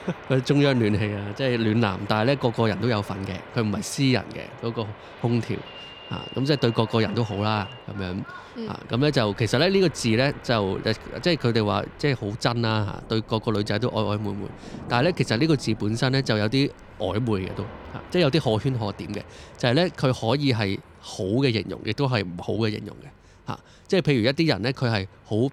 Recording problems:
train or aircraft noise; noticeable; throughout; 20 dB below the speech
rain or running water; faint; throughout; 25 dB below the speech

